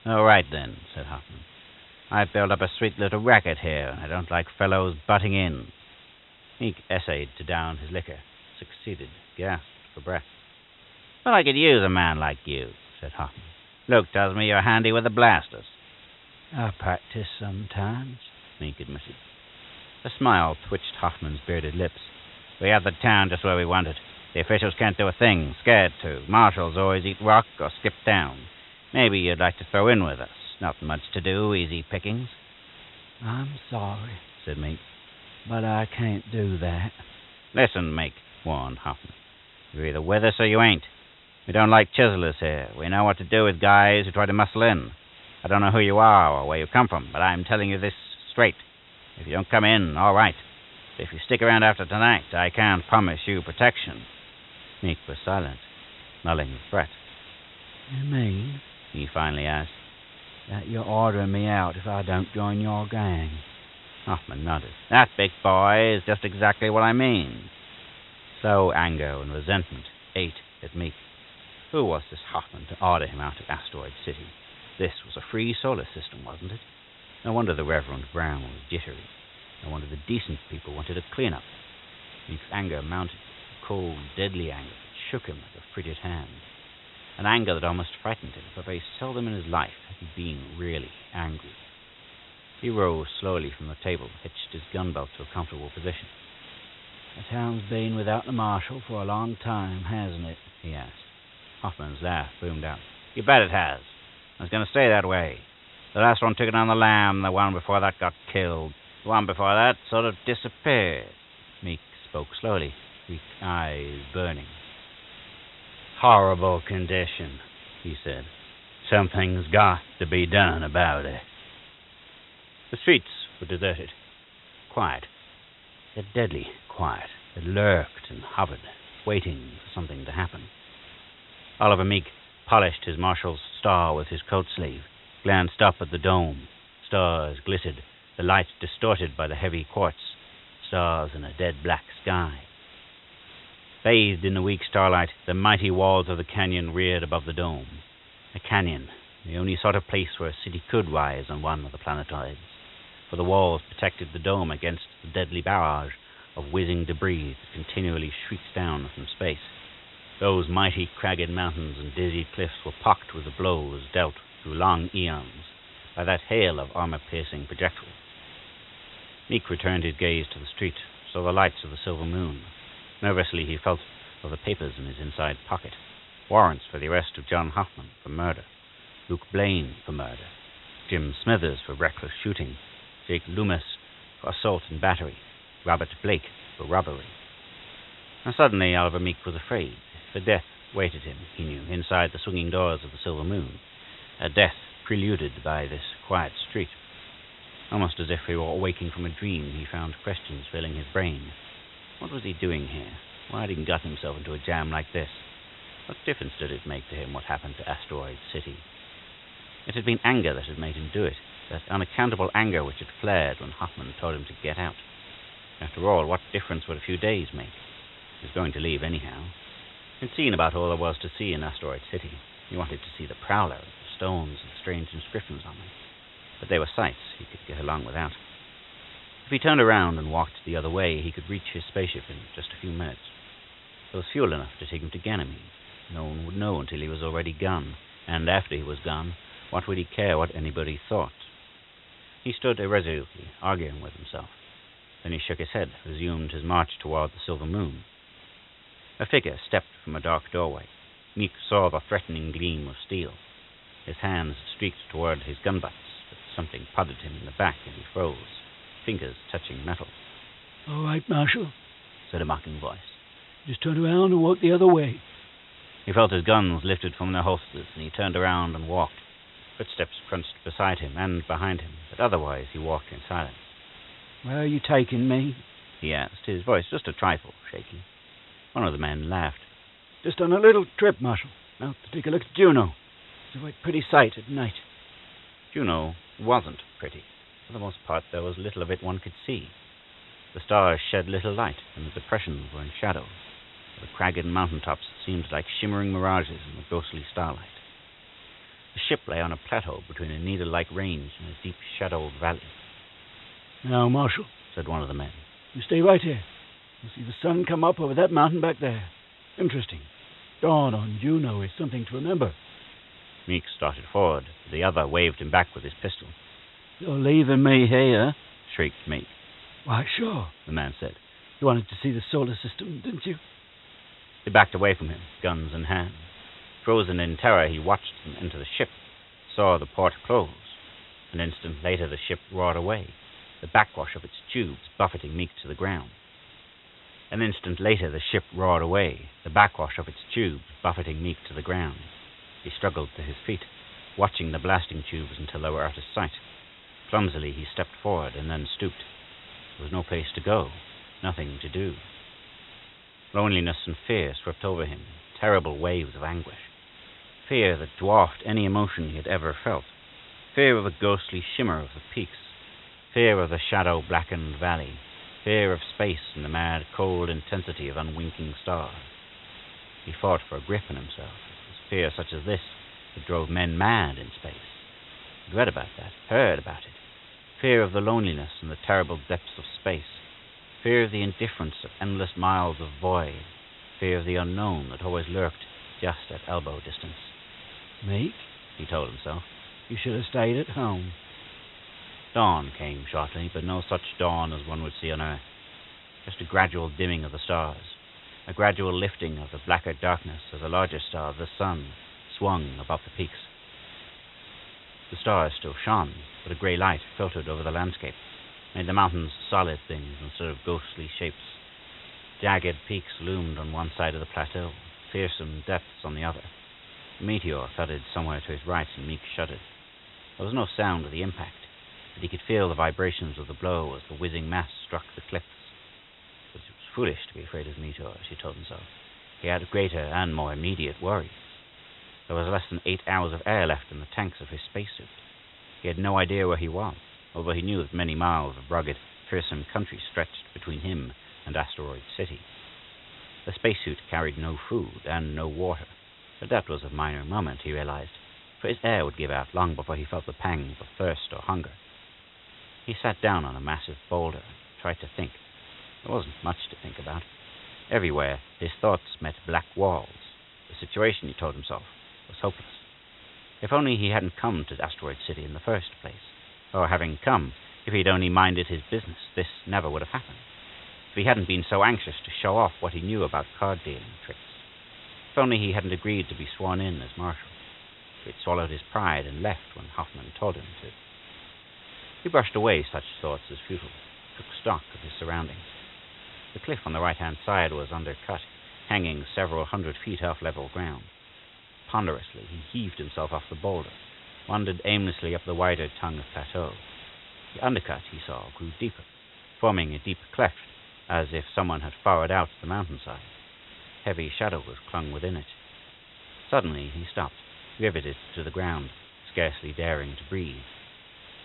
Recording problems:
high frequencies cut off; severe; nothing above 4 kHz
hiss; faint; throughout; 20 dB below the speech

